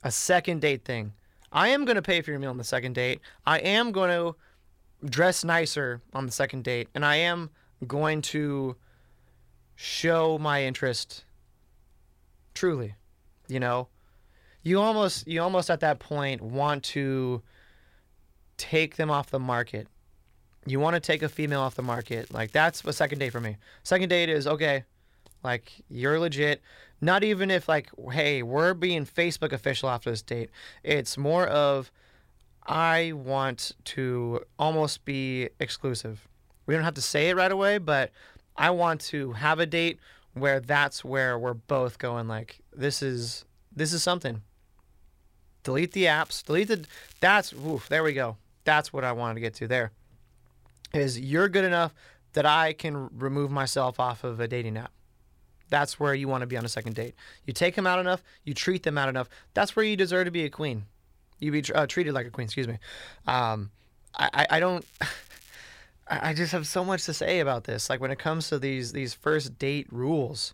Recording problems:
crackling; faint; 4 times, first at 21 s; 25 dB below the speech

